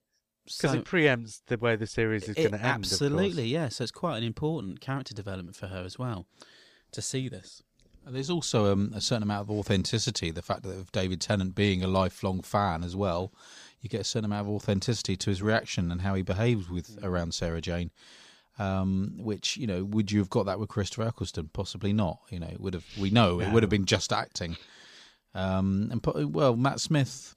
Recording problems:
none

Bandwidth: 15 kHz